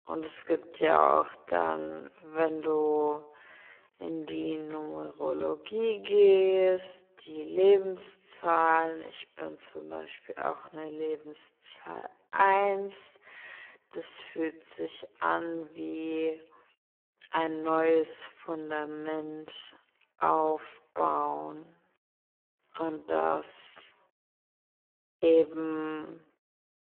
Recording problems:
phone-call audio; poor line
wrong speed, natural pitch; too slow; 0.5 times normal speed

